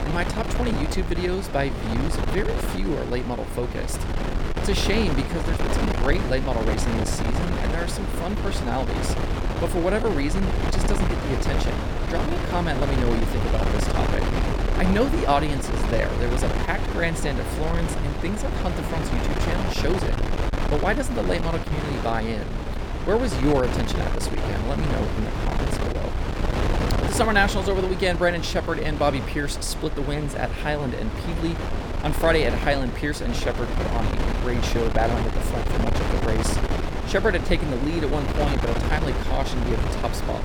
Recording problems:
wind noise on the microphone; heavy; 3 dB below the speech

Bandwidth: 18 kHz